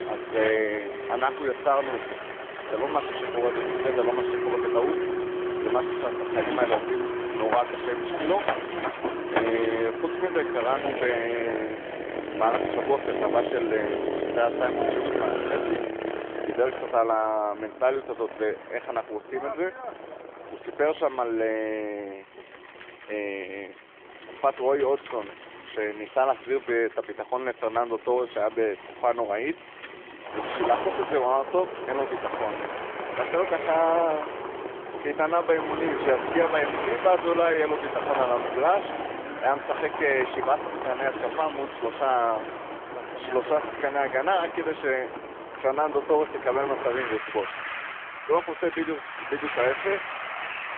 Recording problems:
phone-call audio; nothing above 3.5 kHz
traffic noise; loud; throughout; 4 dB below the speech

